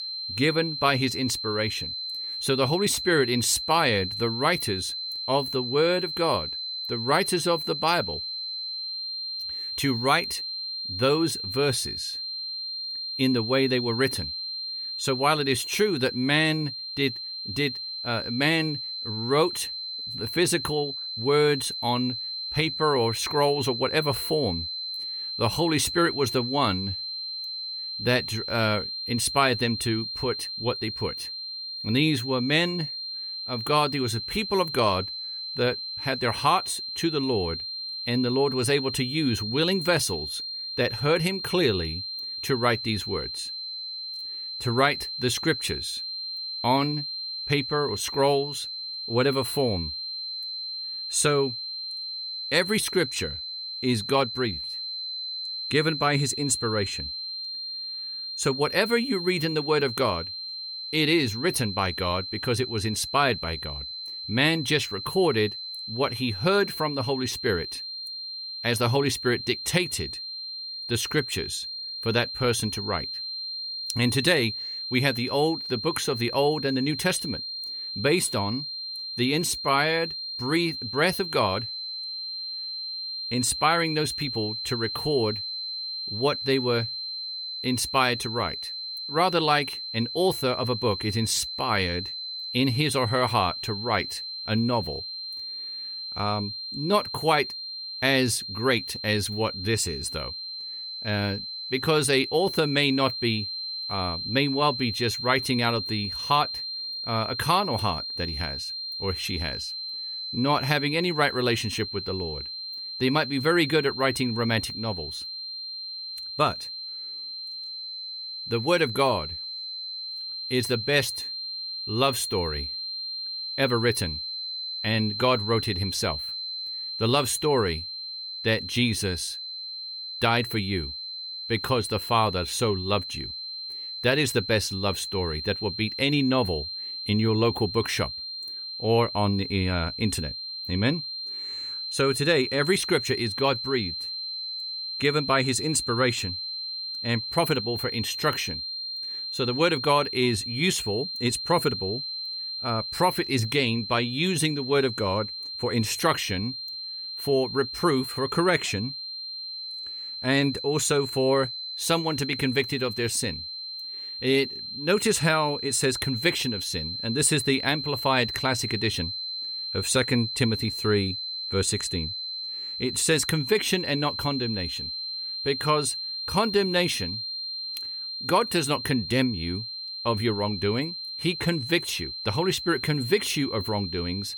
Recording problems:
high-pitched whine; loud; throughout; 4 kHz, 5 dB below the speech

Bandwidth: 18 kHz